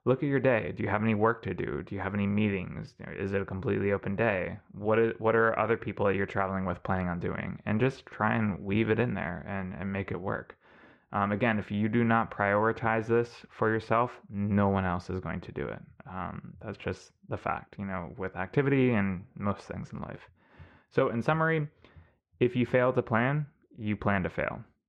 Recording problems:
muffled; very; fading above 2 kHz

